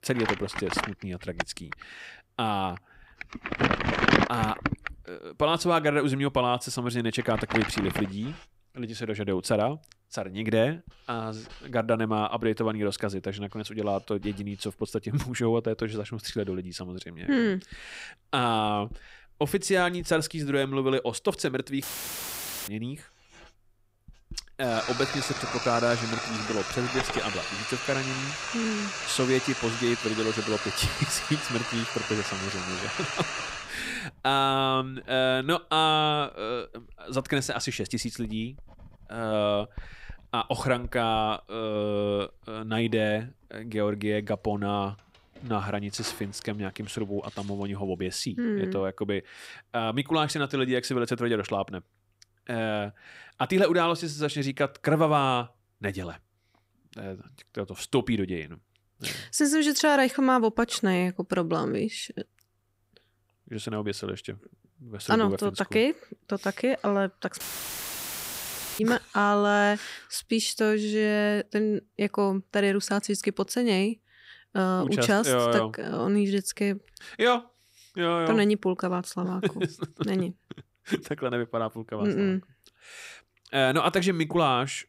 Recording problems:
household noises; loud; until 48 s; 3 dB below the speech
audio cutting out; filled with static; at 22 s for 1 s and at 1:07 for 1.5 s

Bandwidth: 15.5 kHz